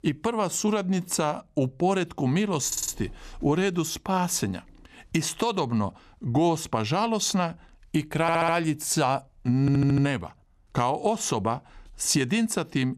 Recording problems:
audio stuttering; at 2.5 s, at 8 s and at 9.5 s

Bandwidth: 14 kHz